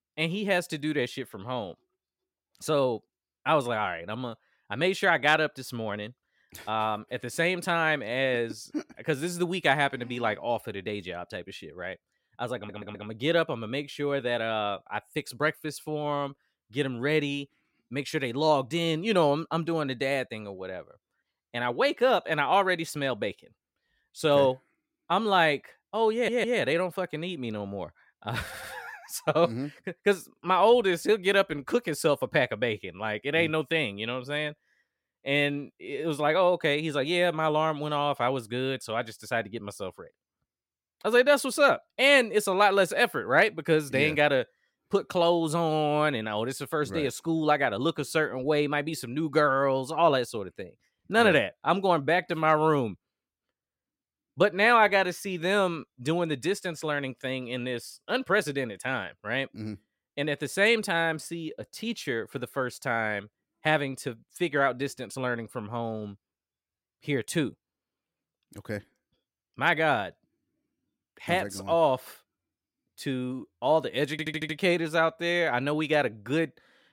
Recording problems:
audio stuttering; 4 times, first at 13 s

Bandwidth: 16.5 kHz